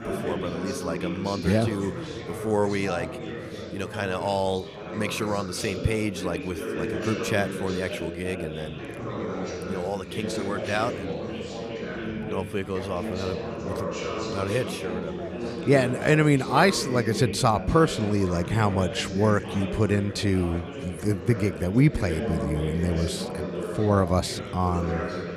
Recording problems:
background chatter; loud; throughout; 4 voices, 7 dB below the speech

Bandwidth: 14.5 kHz